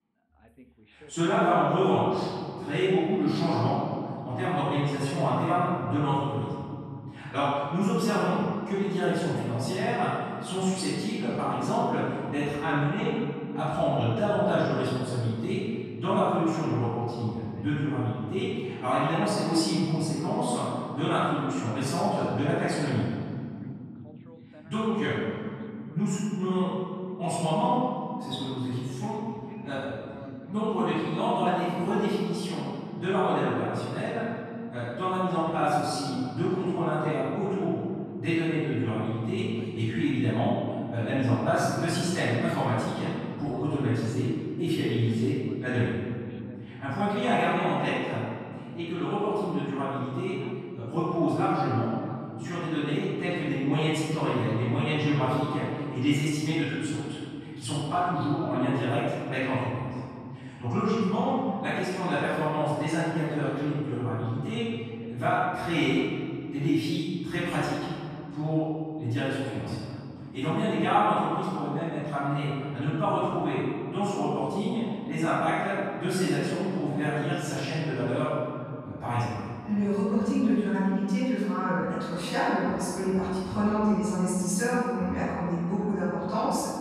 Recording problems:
room echo; strong; dies away in 2.5 s
off-mic speech; far
voice in the background; faint; throughout; 25 dB below the speech

